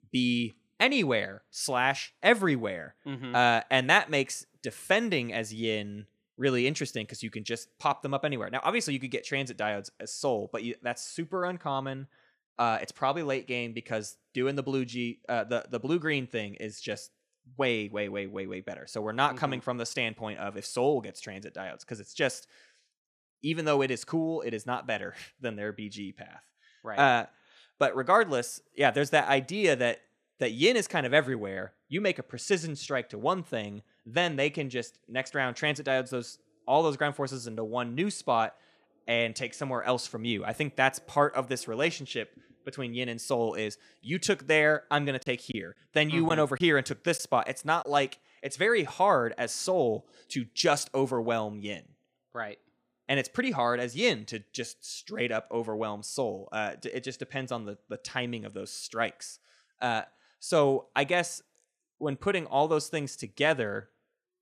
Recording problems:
choppy; occasionally; from 45 to 48 s; 3% of the speech affected

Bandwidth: 14.5 kHz